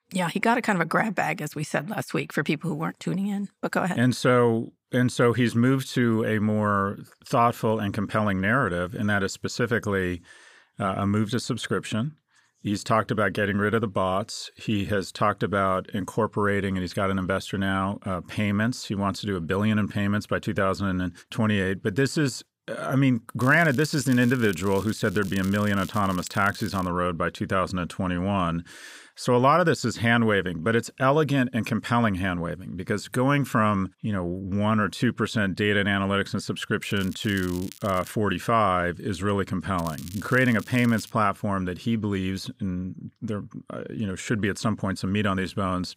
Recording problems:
crackling; noticeable; from 23 to 27 s, from 37 to 38 s and from 40 to 41 s; 20 dB below the speech

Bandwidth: 15.5 kHz